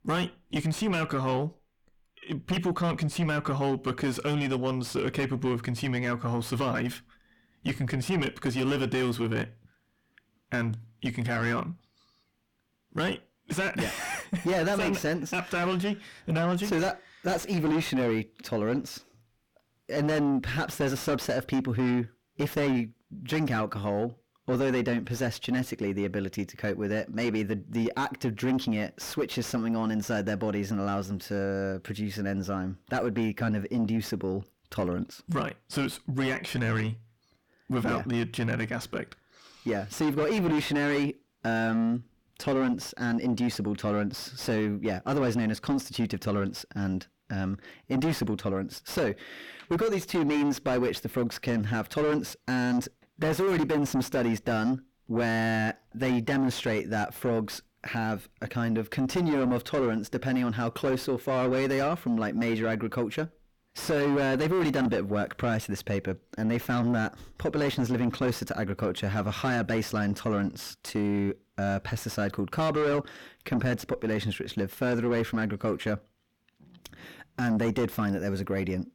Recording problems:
distortion; heavy; 6 dB below the speech

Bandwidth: 18.5 kHz